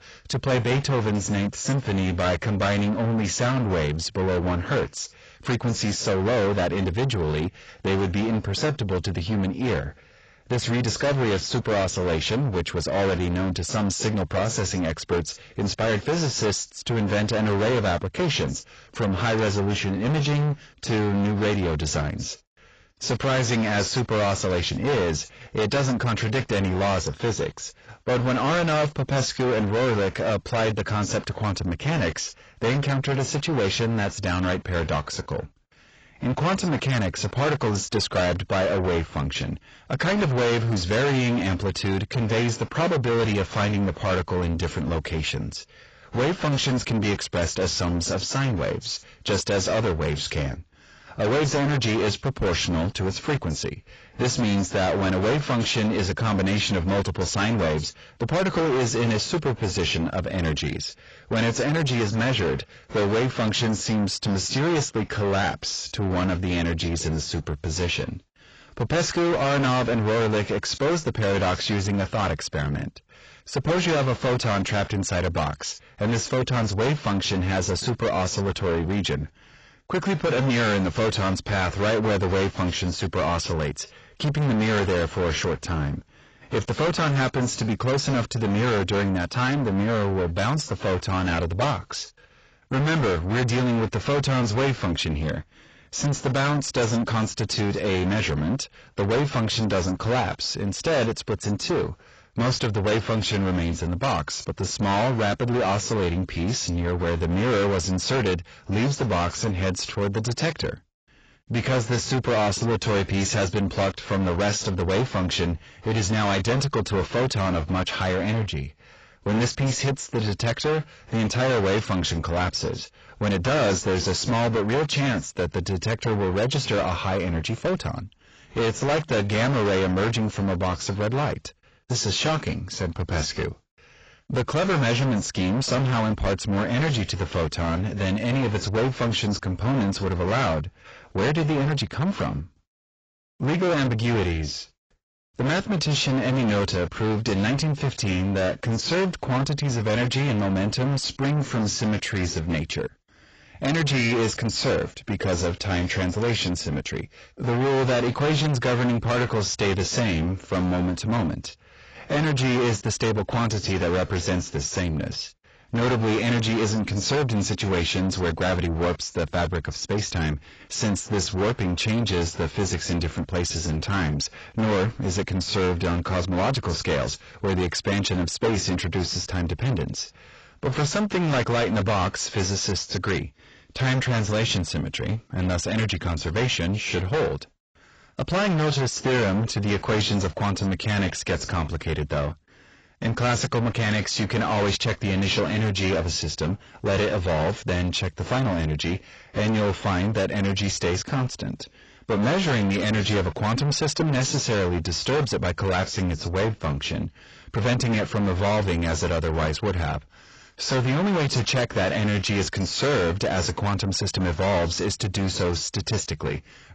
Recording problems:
distortion; heavy; 6 dB below the speech
garbled, watery; badly; nothing above 7.5 kHz

